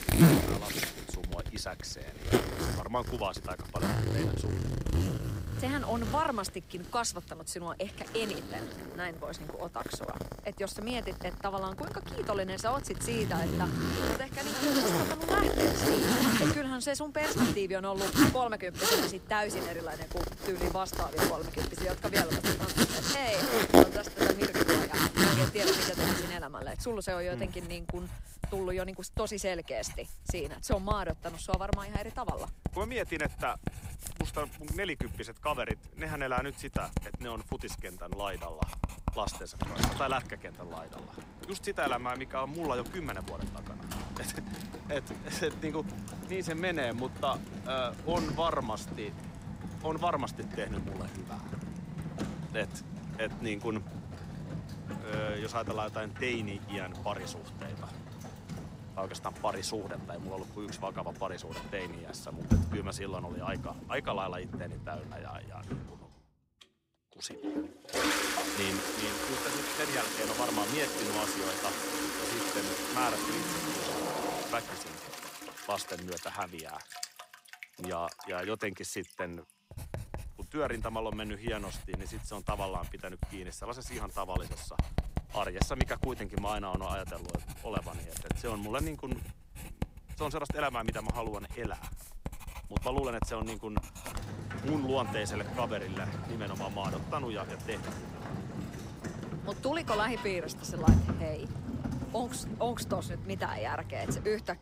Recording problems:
household noises; very loud; throughout; 2 dB above the speech

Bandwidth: 15.5 kHz